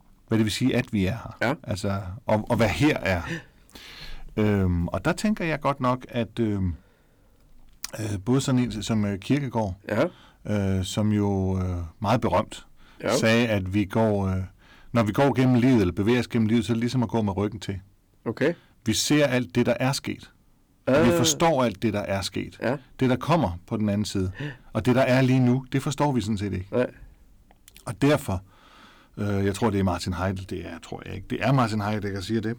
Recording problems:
distortion; slight; 4% of the sound clipped

